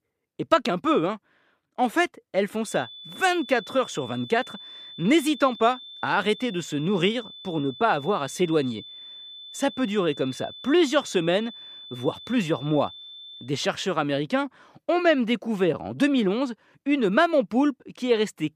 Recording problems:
high-pitched whine; noticeable; from 2.5 to 13 s; 3.5 kHz, 15 dB below the speech

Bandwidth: 15 kHz